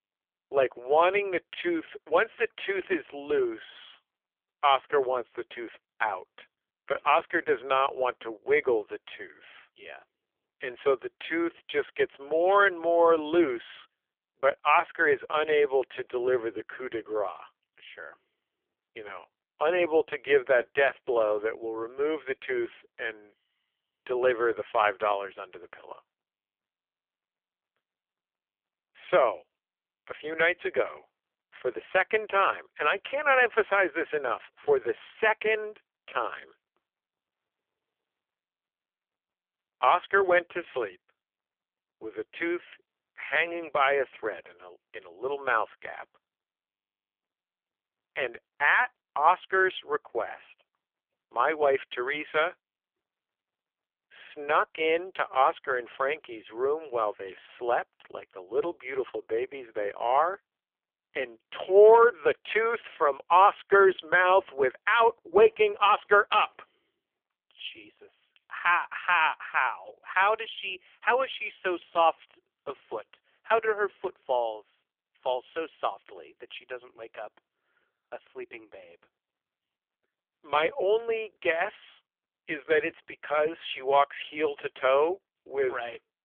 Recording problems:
phone-call audio; poor line; nothing above 3.5 kHz

